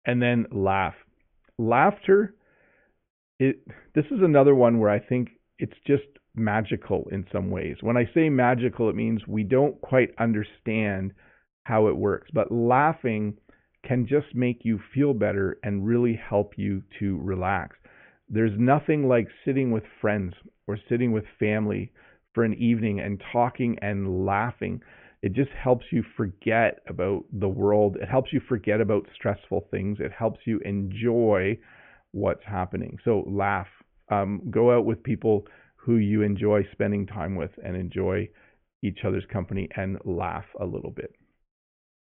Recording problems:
high frequencies cut off; severe; nothing above 3 kHz

